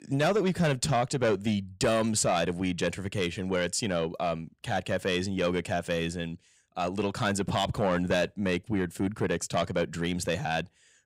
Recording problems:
distortion; slight; 10 dB below the speech

